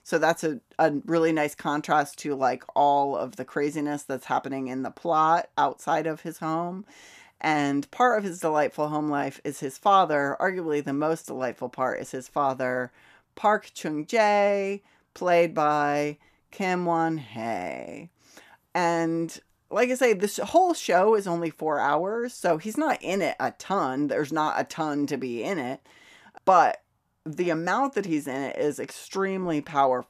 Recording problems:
none

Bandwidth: 14.5 kHz